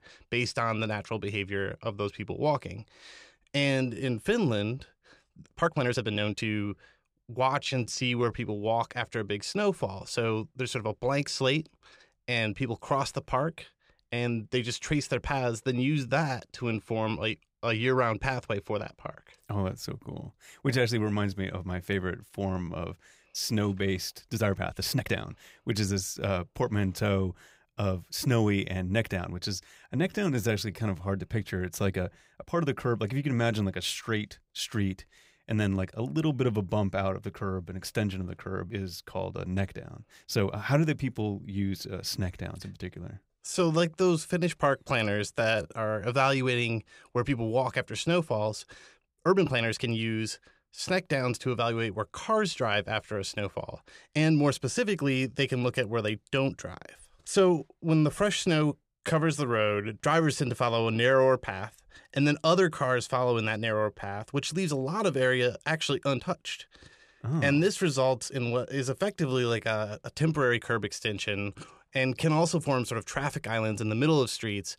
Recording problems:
uneven, jittery; strongly; from 3.5 s to 1:13

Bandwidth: 15.5 kHz